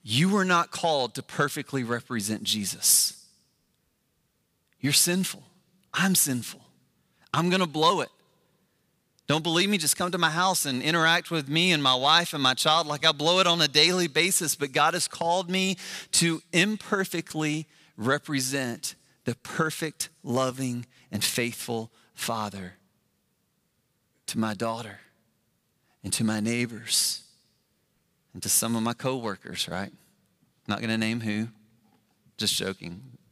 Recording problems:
none

